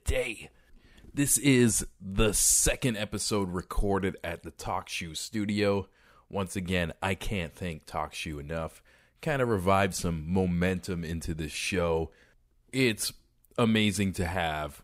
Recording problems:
none

